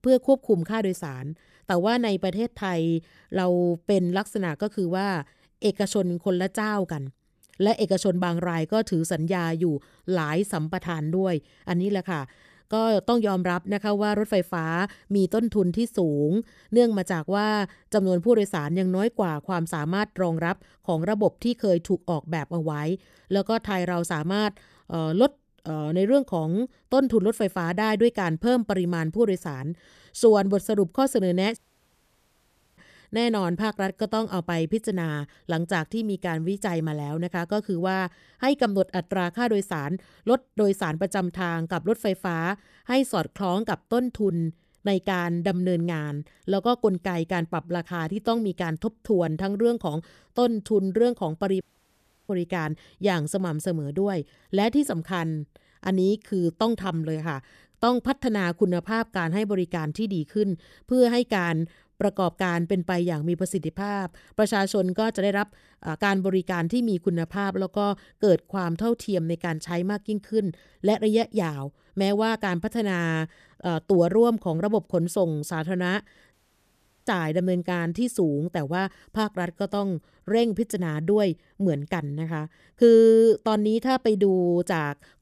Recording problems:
audio cutting out; at 32 s for 1 s, at 52 s for 0.5 s and at 1:16 for 0.5 s

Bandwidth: 14.5 kHz